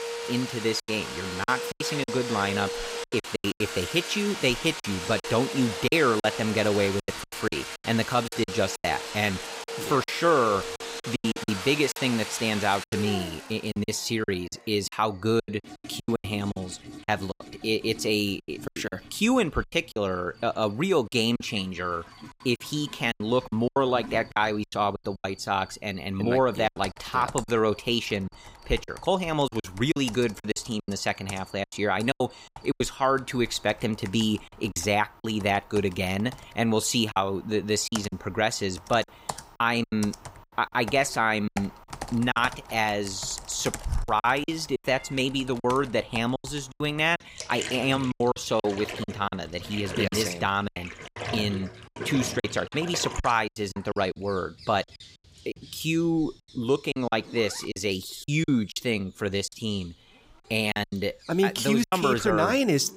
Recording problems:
household noises; loud; throughout; 10 dB below the speech
animal sounds; faint; throughout; 30 dB below the speech
choppy; very; 10% of the speech affected

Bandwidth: 15.5 kHz